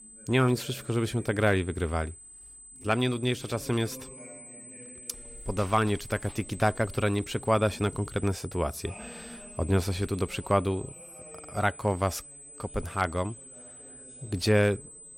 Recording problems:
high-pitched whine; noticeable; throughout; 8 kHz, 15 dB below the speech
voice in the background; faint; throughout; 25 dB below the speech

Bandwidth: 16 kHz